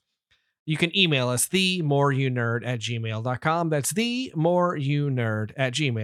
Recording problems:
abrupt cut into speech; at the end

